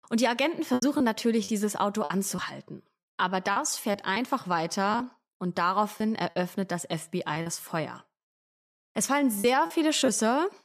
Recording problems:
choppy; very; 6% of the speech affected

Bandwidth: 14.5 kHz